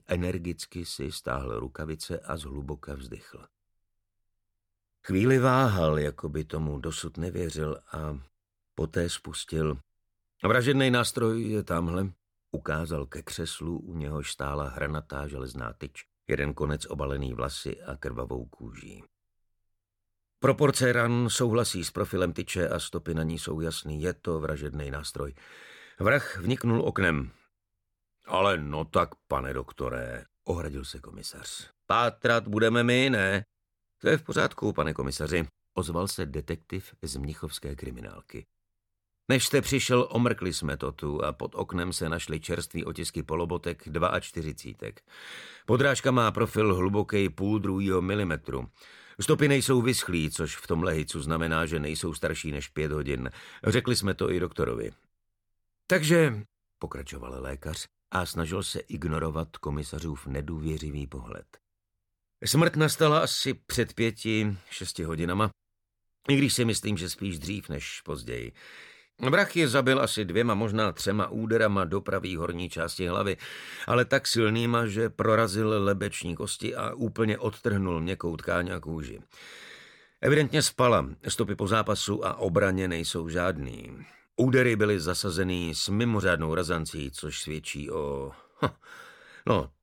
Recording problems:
none

